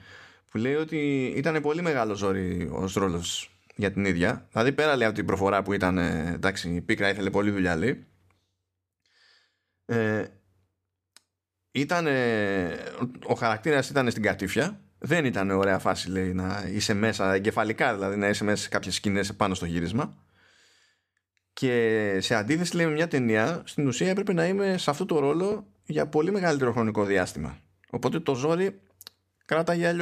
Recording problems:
abrupt cut into speech; at the end

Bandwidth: 14.5 kHz